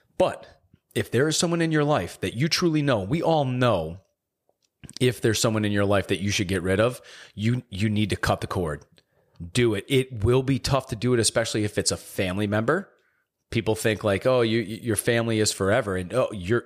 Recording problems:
none

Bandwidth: 15 kHz